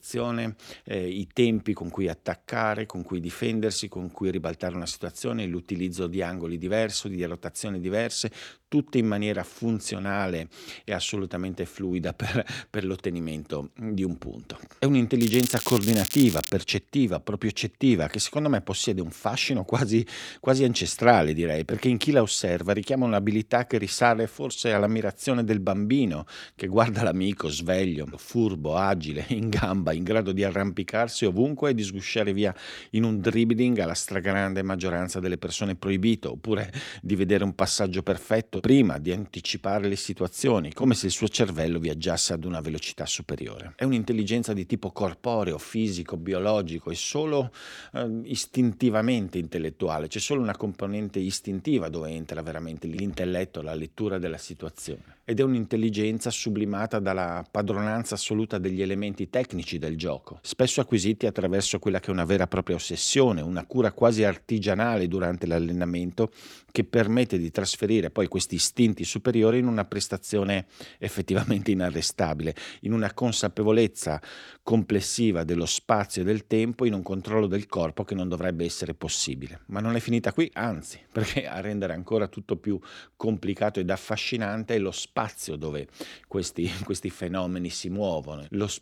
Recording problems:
crackling; loud; from 15 to 17 s; 4 dB below the speech

